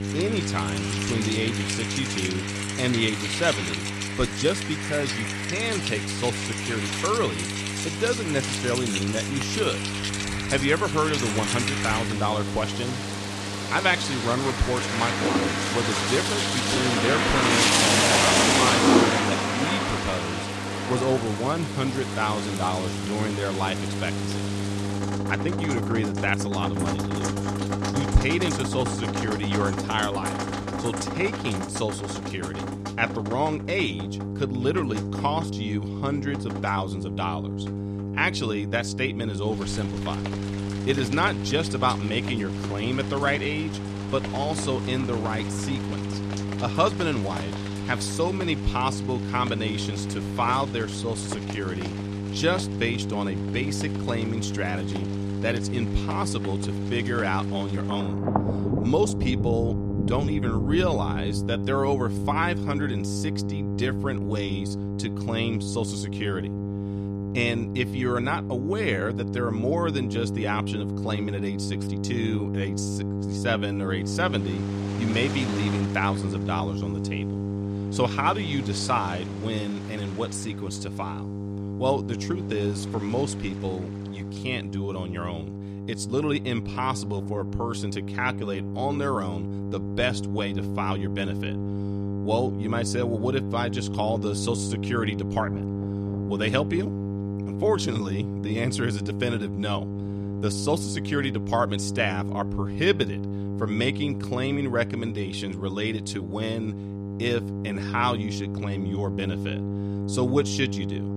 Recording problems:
rain or running water; very loud; throughout; as loud as the speech
electrical hum; loud; throughout; 50 Hz, 9 dB below the speech

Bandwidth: 14.5 kHz